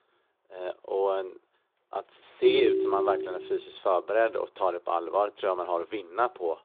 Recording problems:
phone-call audio
phone ringing; loud; at 2.5 s; peak 4 dB above the speech

